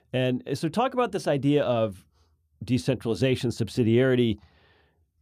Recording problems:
none

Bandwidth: 14.5 kHz